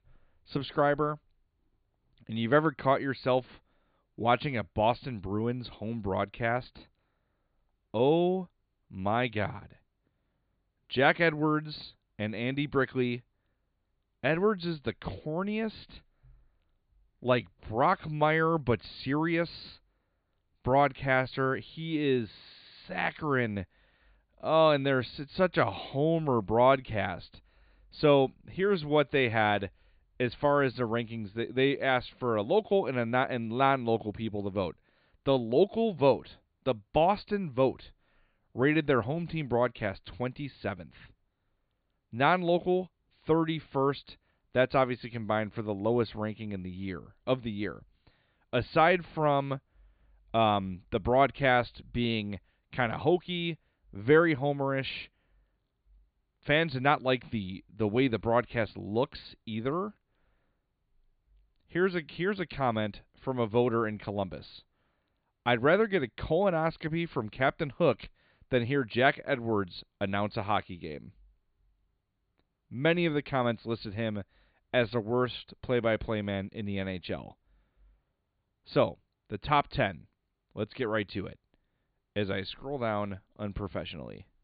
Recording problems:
high frequencies cut off; severe; nothing above 4.5 kHz

